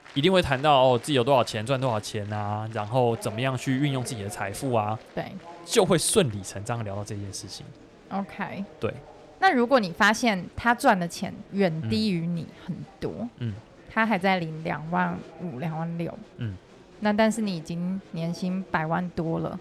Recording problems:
murmuring crowd; faint; throughout; 20 dB below the speech

